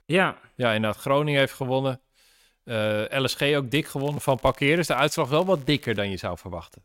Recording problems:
crackling; faint; from 3.5 to 6 s; 25 dB below the speech

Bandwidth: 16 kHz